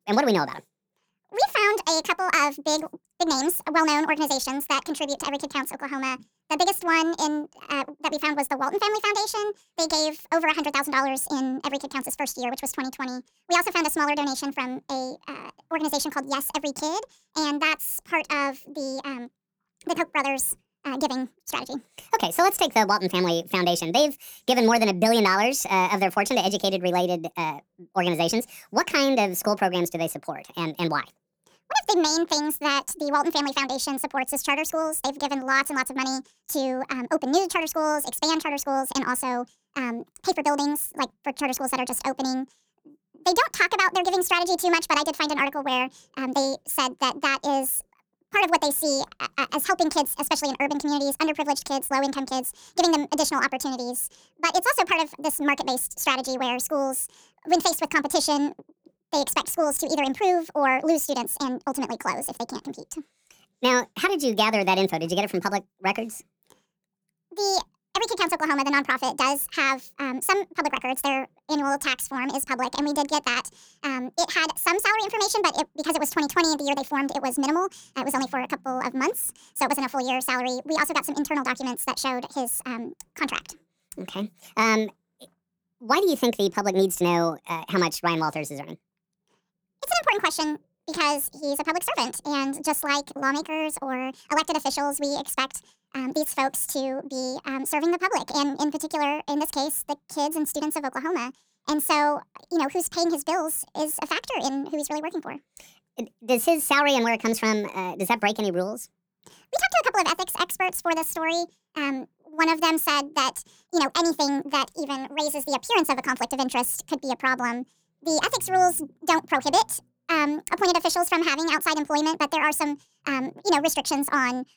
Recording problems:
wrong speed and pitch; too fast and too high; 1.6 times normal speed

